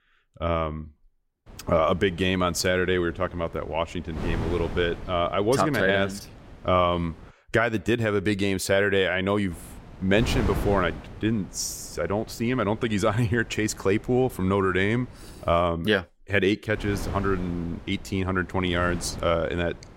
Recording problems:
wind noise on the microphone; occasional gusts; from 1.5 to 7.5 s, from 9.5 to 16 s and from 17 s on; 20 dB below the speech

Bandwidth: 16 kHz